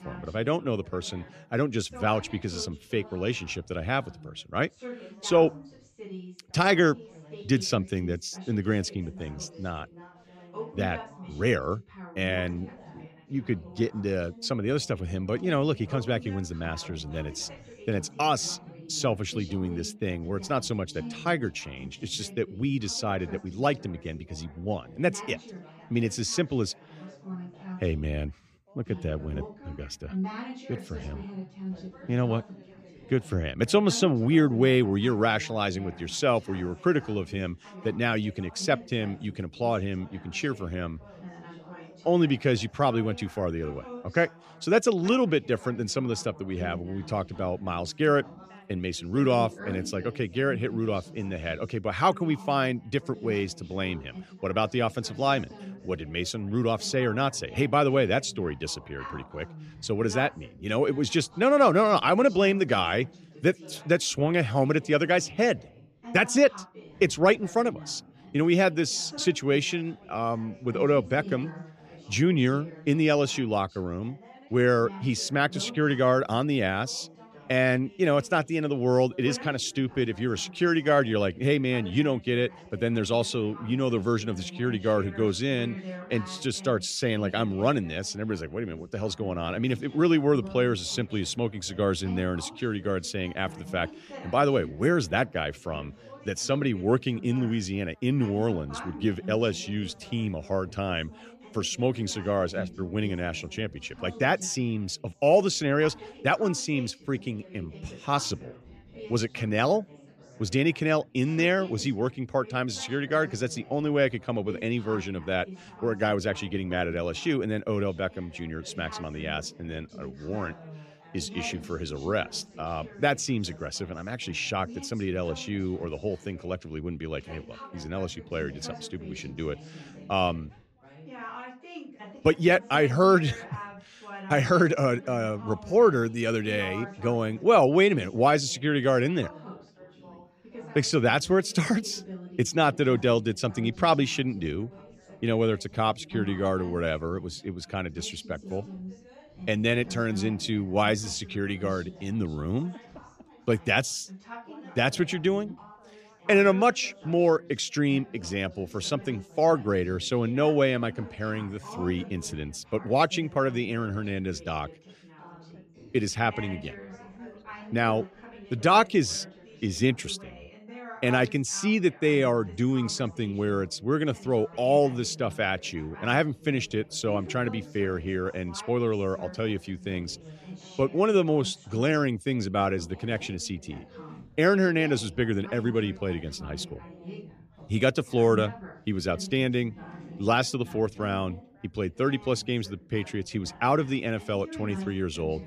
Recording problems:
background chatter; noticeable; throughout; 3 voices, 15 dB below the speech

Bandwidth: 14.5 kHz